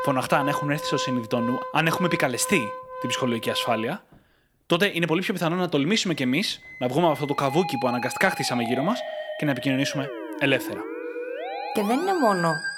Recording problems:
background music; loud; throughout; 8 dB below the speech

